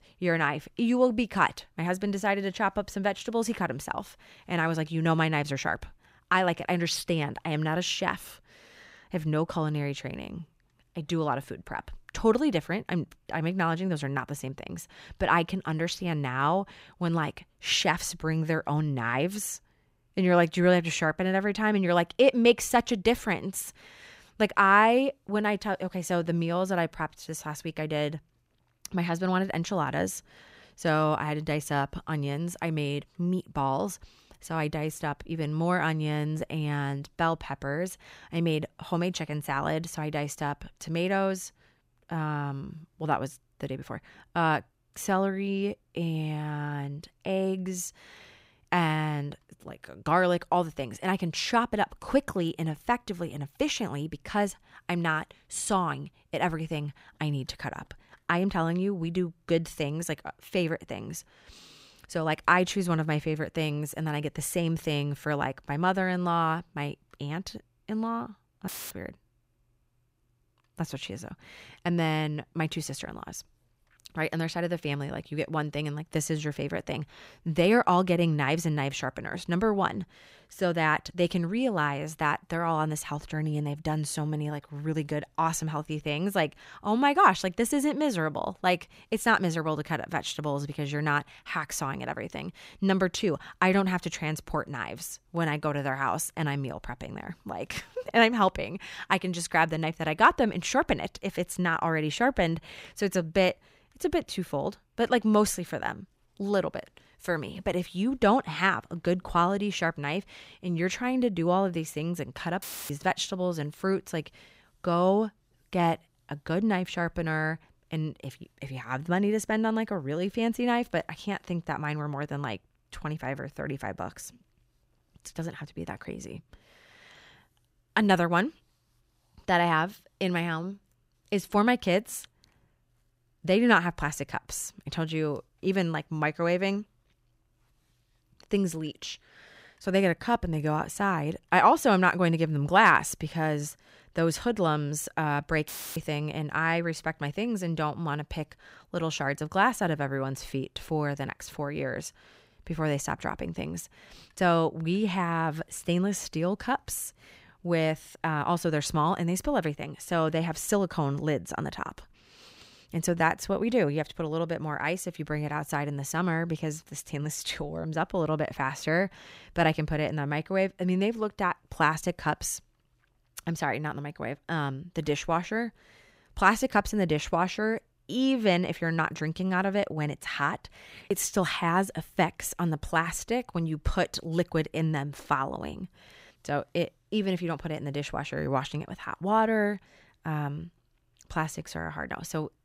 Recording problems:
audio cutting out; filled with static; at 1:09, at 1:53 and at 2:26

